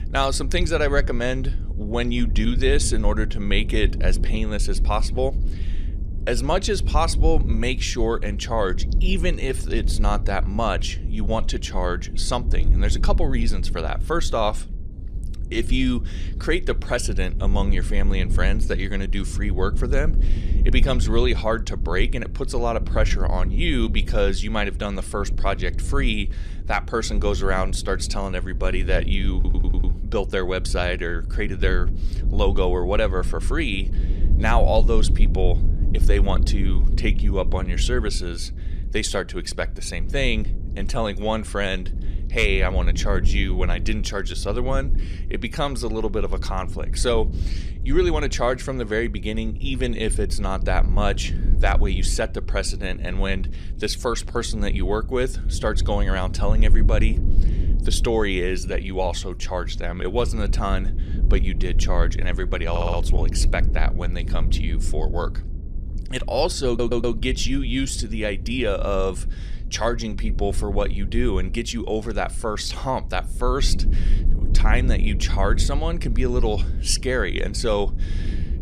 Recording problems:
low rumble; noticeable; throughout; 15 dB below the speech
audio stuttering; at 29 s, at 1:03 and at 1:07

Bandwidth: 14.5 kHz